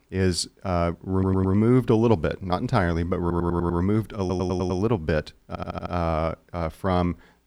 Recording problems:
audio stuttering; 4 times, first at 1 s

